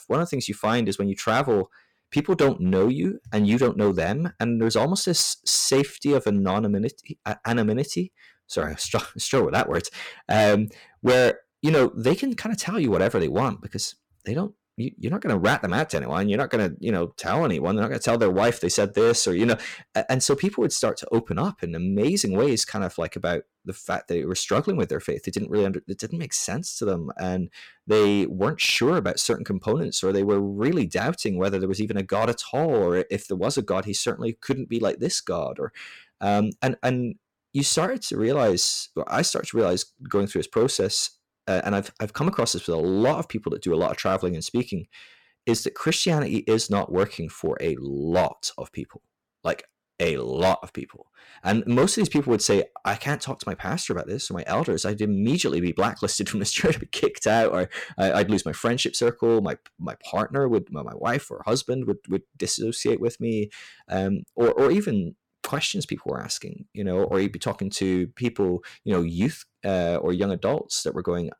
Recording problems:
distortion; slight; 3% of the sound clipped

